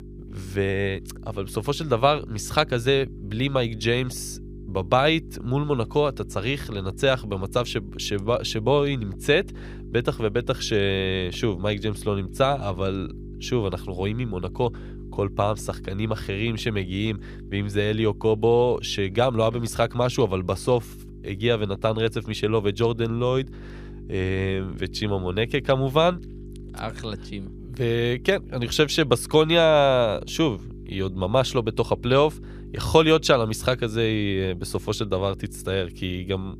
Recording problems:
electrical hum; faint; throughout; 50 Hz, 25 dB below the speech

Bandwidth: 15 kHz